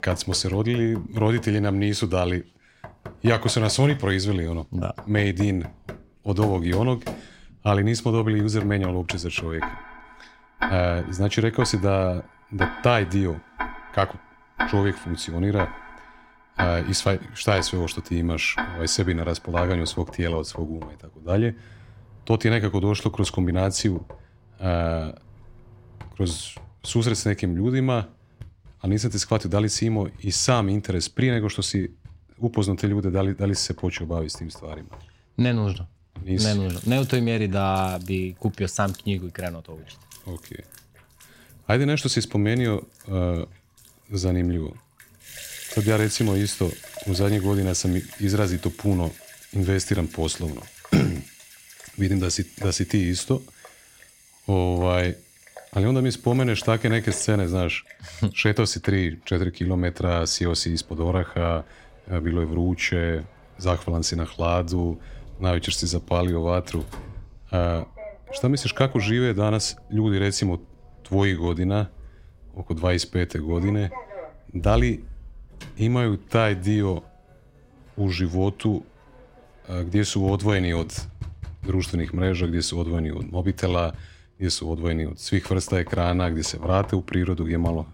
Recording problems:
household noises; noticeable; throughout; 15 dB below the speech

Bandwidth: 16 kHz